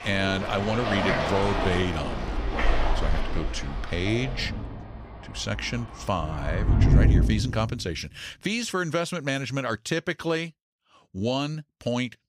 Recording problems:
rain or running water; very loud; until 7 s; 1 dB above the speech

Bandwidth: 15.5 kHz